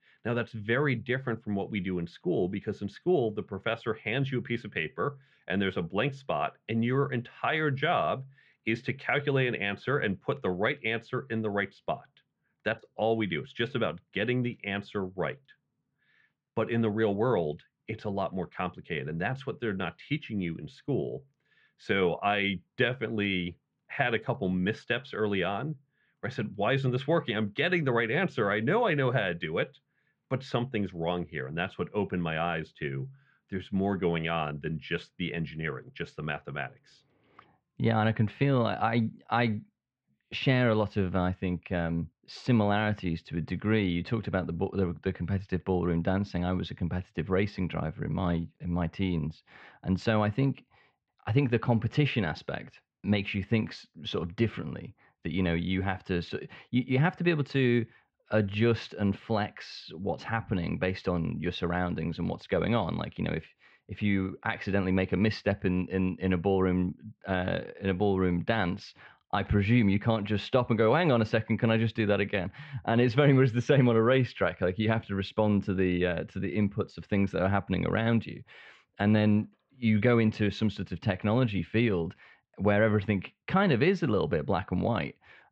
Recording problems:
muffled; very; fading above 3 kHz

